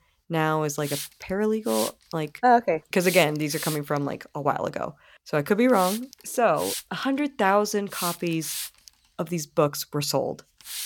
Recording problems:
hiss; loud; throughout; 8 dB below the speech

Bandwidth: 17.5 kHz